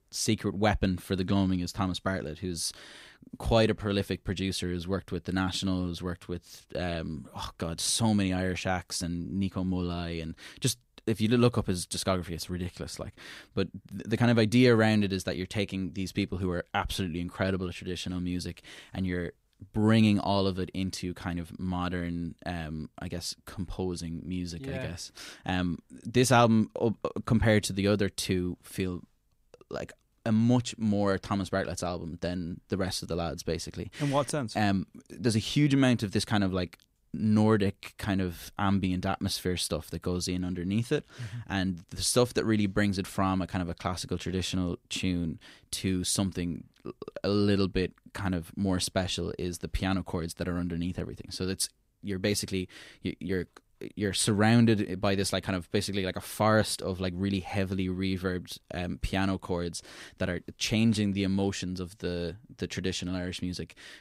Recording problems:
none

